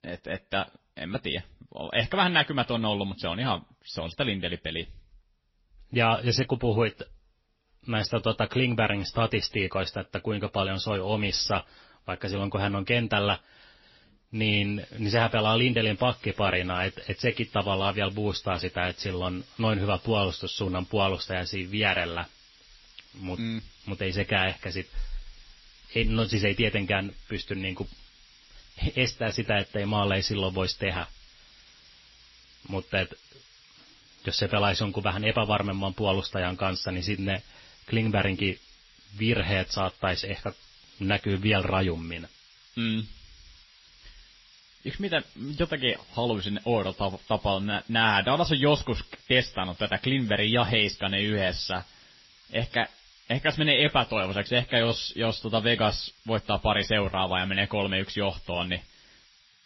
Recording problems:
garbled, watery; slightly; nothing above 5.5 kHz
hiss; faint; from 14 s on; 25 dB below the speech

